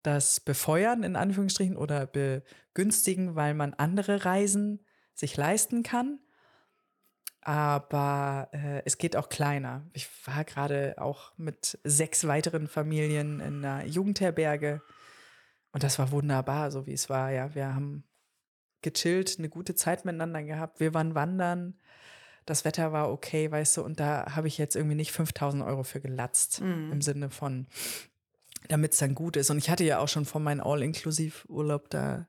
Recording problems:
none

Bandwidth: 18.5 kHz